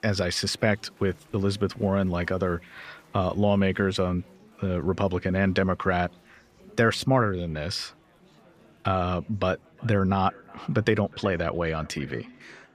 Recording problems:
echo of what is said; faint; from 9.5 s on; 370 ms later, 25 dB below the speech
murmuring crowd; faint; throughout; 30 dB below the speech

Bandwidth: 15 kHz